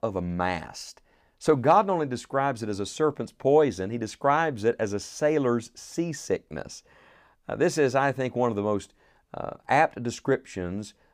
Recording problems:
none

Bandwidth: 15 kHz